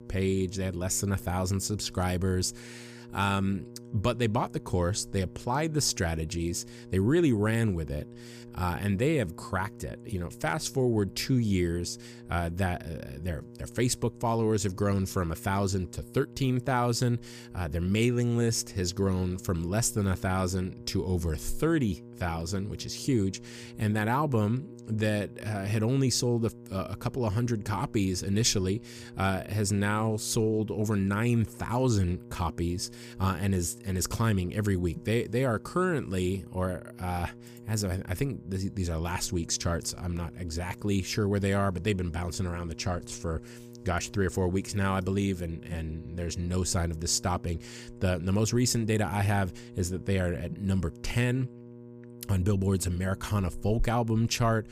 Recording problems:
electrical hum; noticeable; throughout; 60 Hz, 20 dB below the speech

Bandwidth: 15 kHz